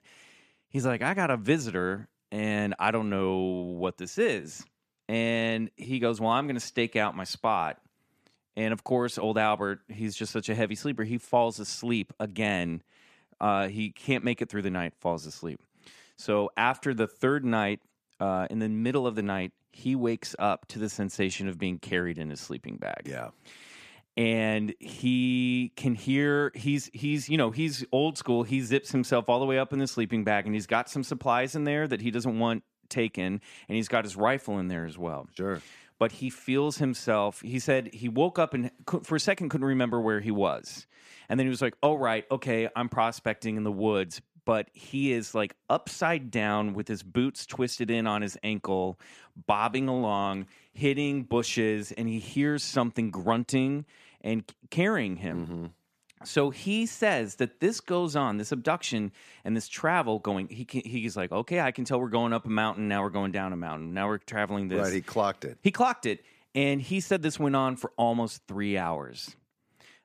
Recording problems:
none

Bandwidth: 14.5 kHz